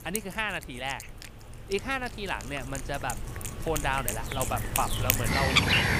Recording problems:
animal sounds; very loud; throughout; 4 dB above the speech

